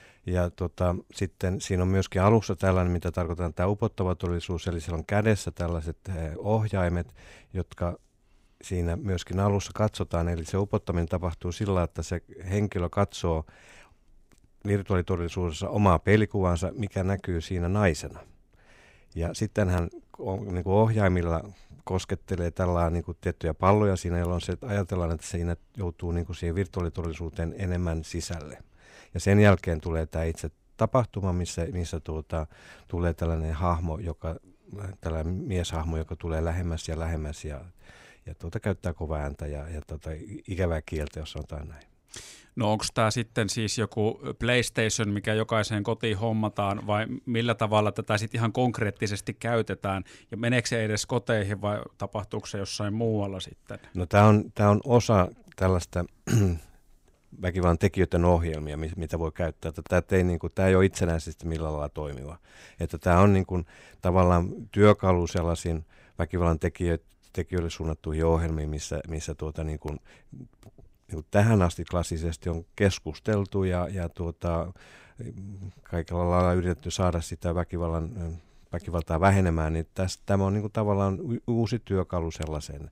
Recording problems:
none

